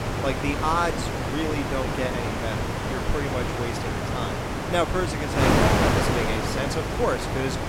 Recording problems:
wind noise on the microphone; heavy; 1 dB above the speech

